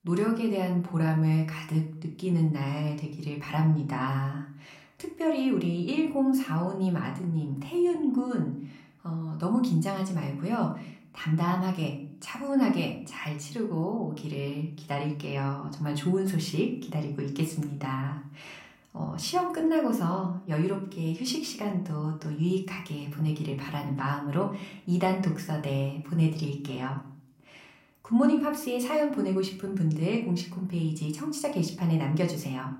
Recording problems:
room echo; slight; dies away in 0.4 s
off-mic speech; somewhat distant

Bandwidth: 16 kHz